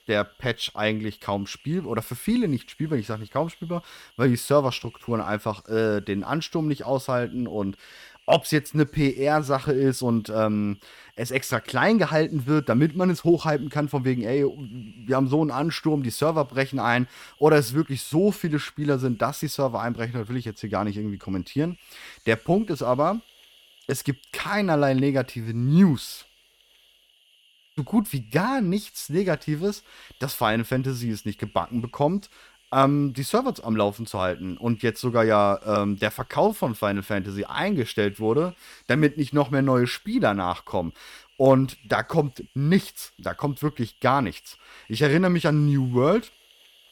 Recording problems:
hiss; faint; throughout; 30 dB below the speech

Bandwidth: 17.5 kHz